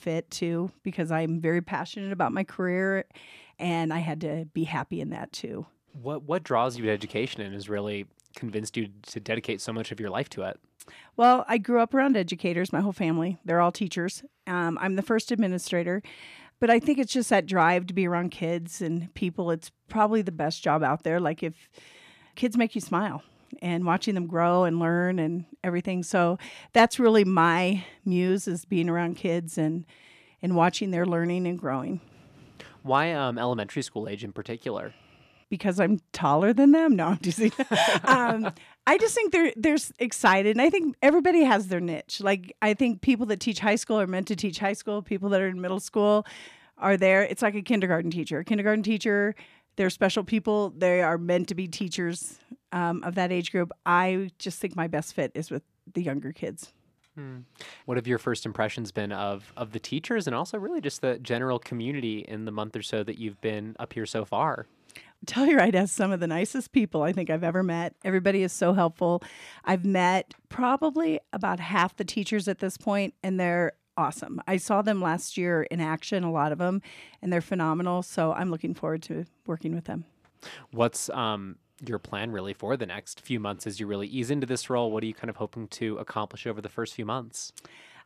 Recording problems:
none

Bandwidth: 14.5 kHz